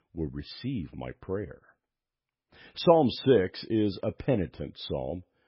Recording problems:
garbled, watery; badly; nothing above 5.5 kHz

